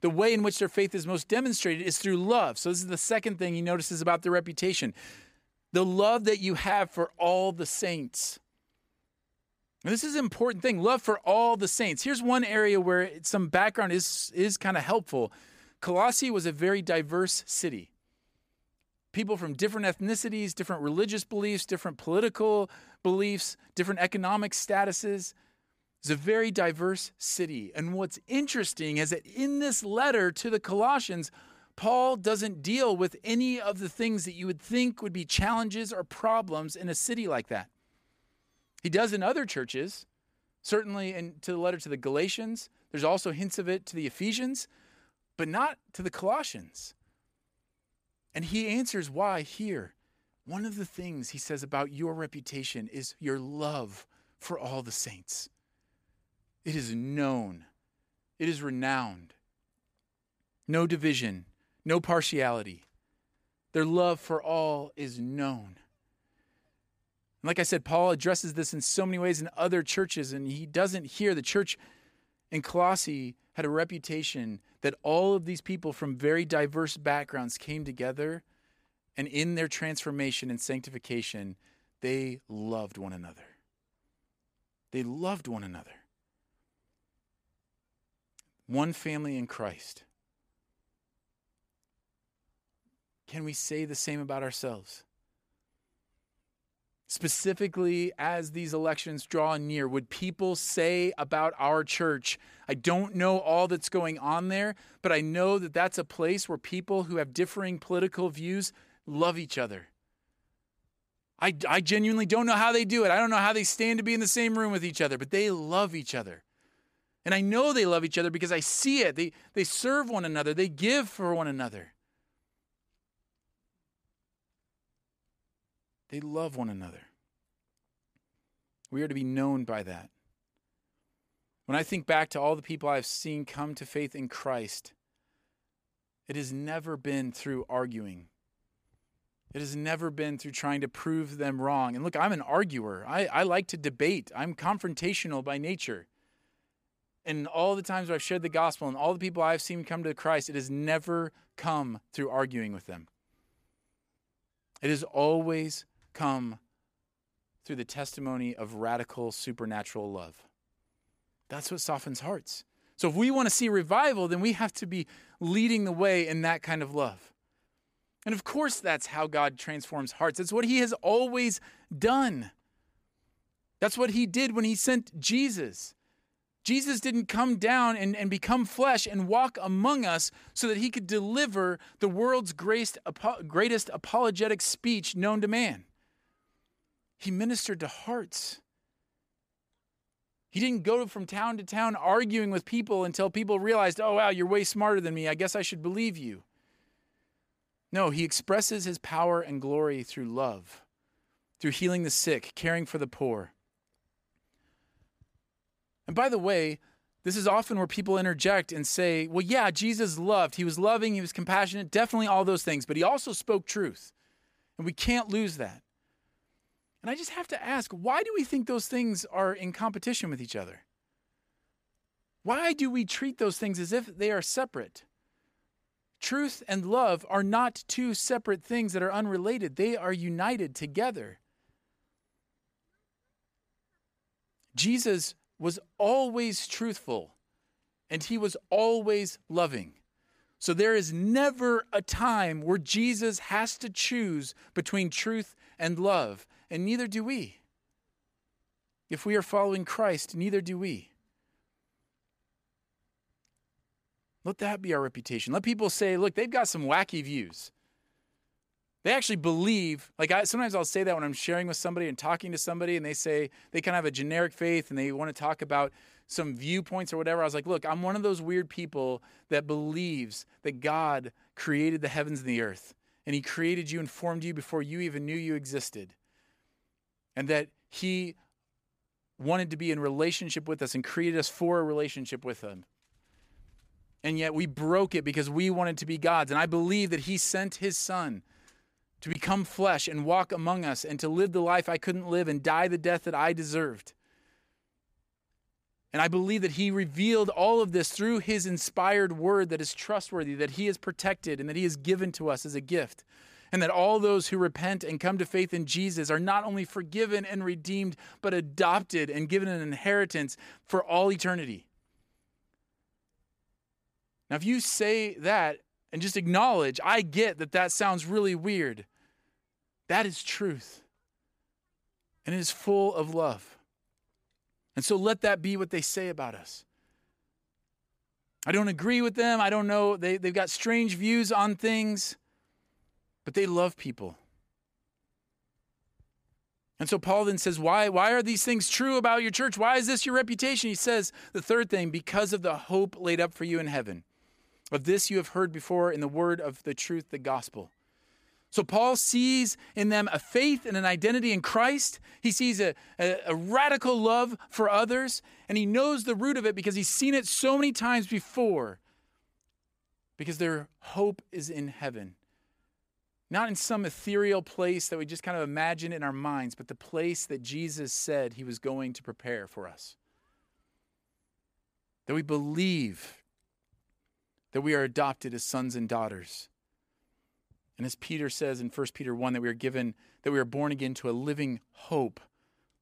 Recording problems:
none

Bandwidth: 15 kHz